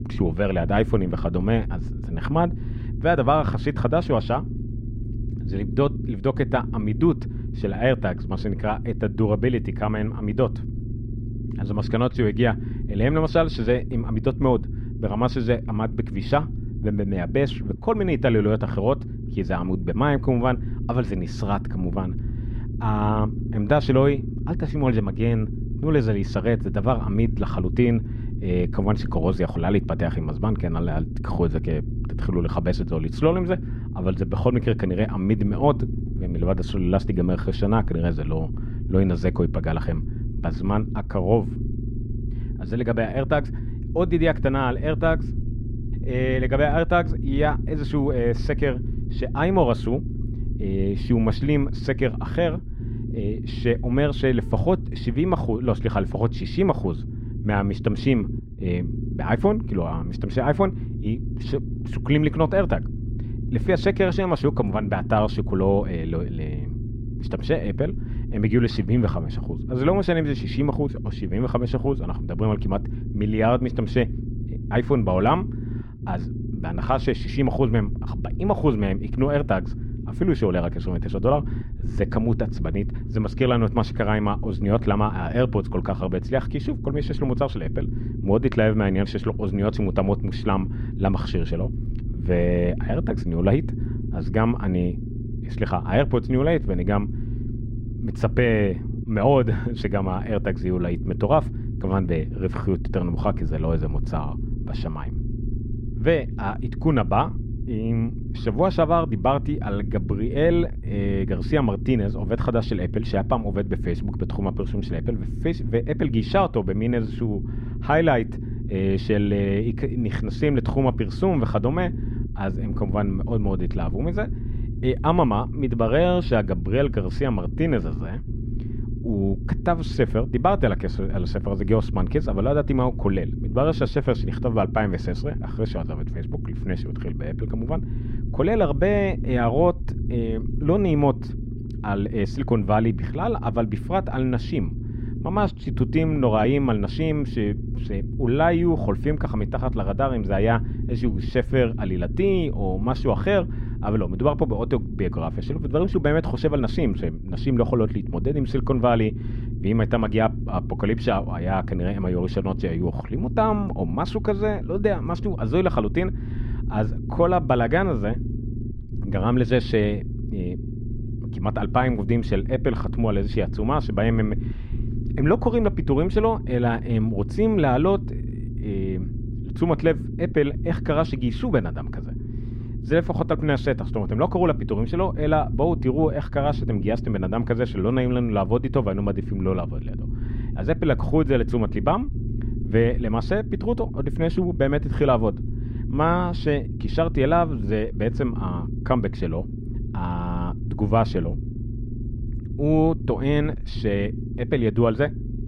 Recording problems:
muffled; slightly; fading above 4 kHz
low rumble; noticeable; throughout; 15 dB below the speech

